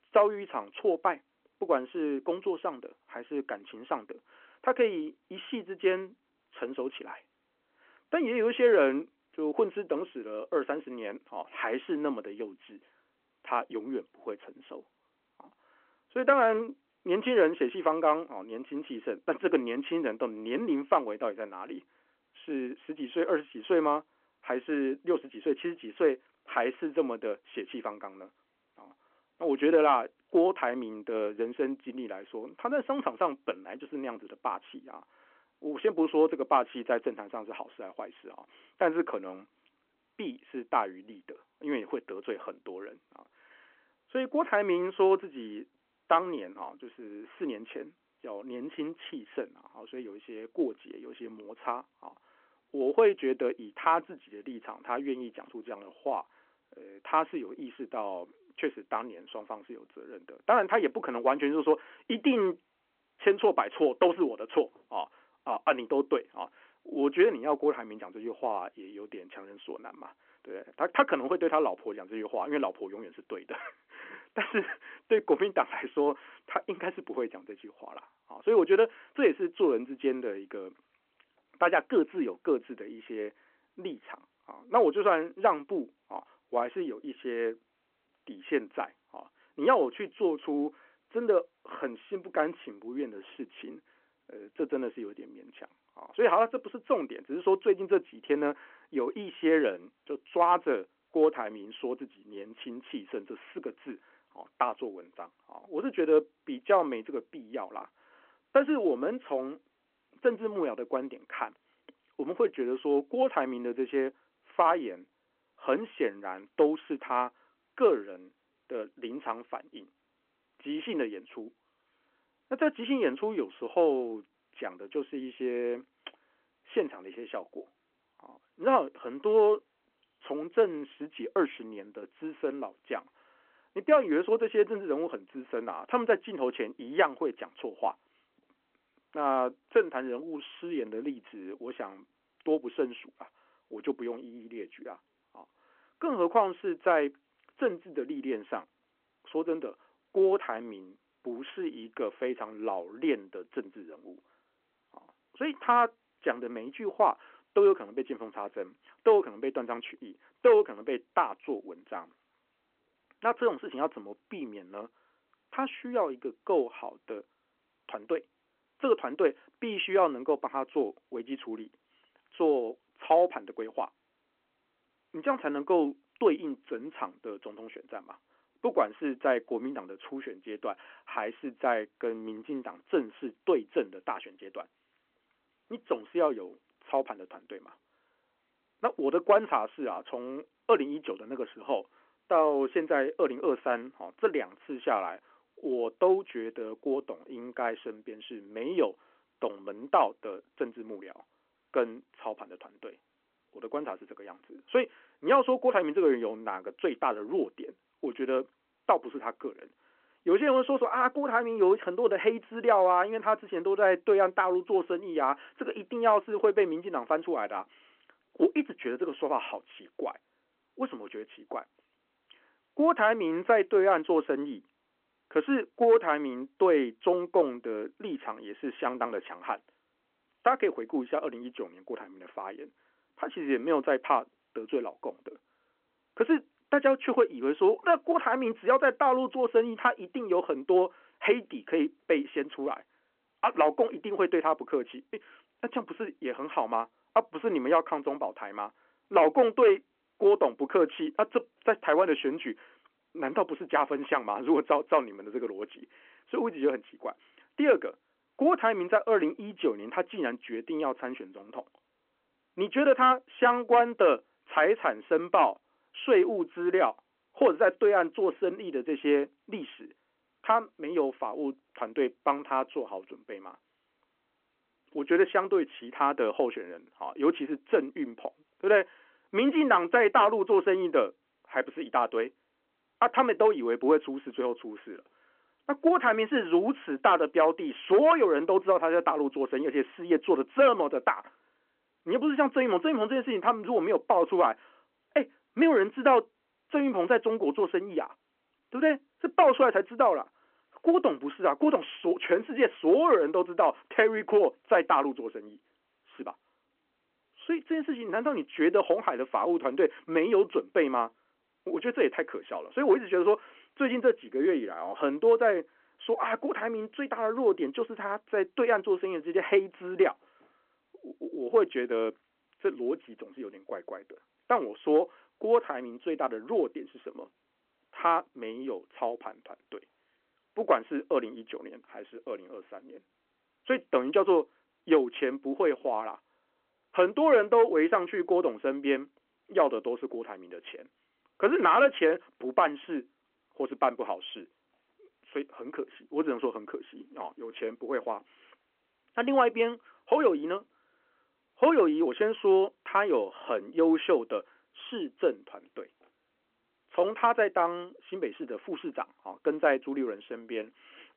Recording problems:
phone-call audio

